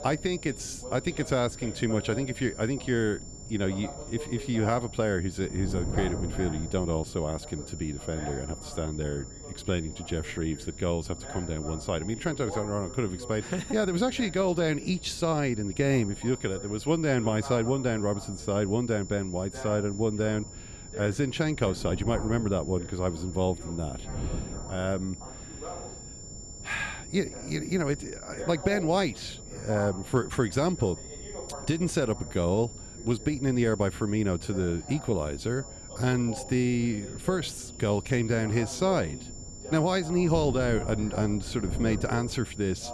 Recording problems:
high-pitched whine; noticeable; throughout; 7 kHz, 15 dB below the speech
voice in the background; noticeable; throughout; 15 dB below the speech
wind noise on the microphone; occasional gusts; 20 dB below the speech

